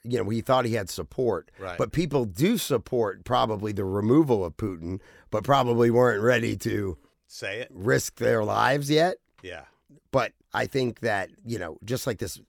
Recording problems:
none

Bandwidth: 18.5 kHz